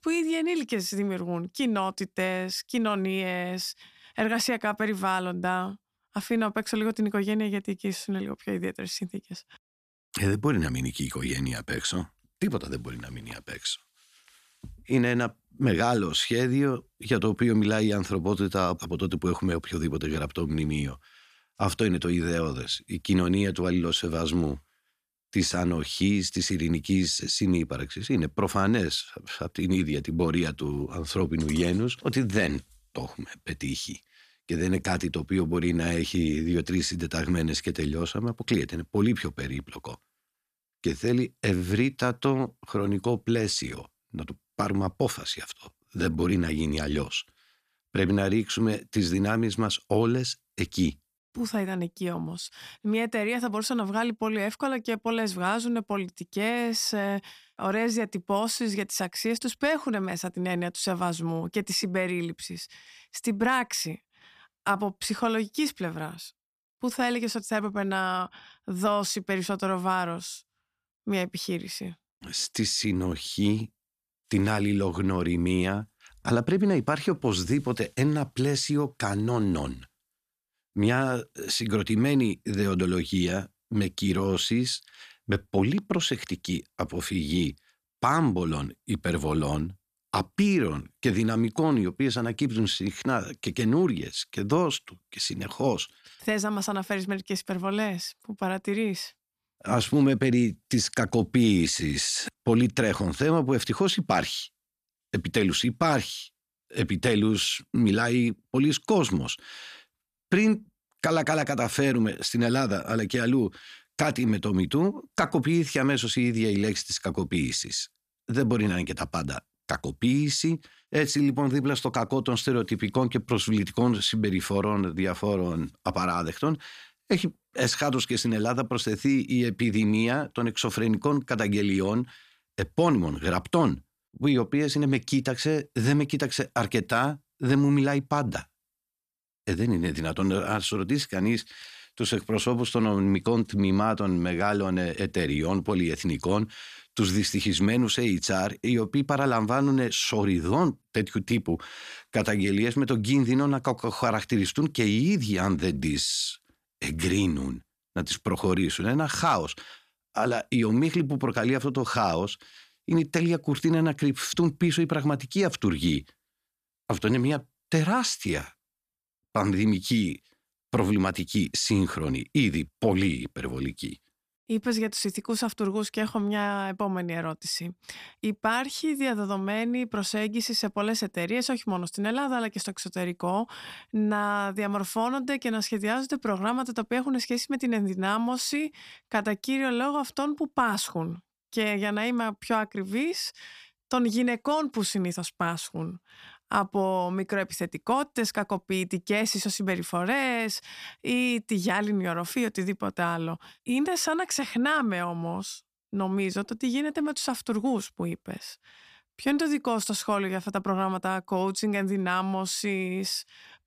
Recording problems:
none

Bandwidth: 14.5 kHz